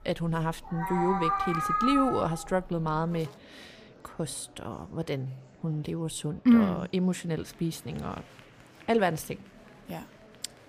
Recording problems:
animal sounds; loud; until 3.5 s; as loud as the speech
murmuring crowd; faint; throughout; 25 dB below the speech

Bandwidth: 15 kHz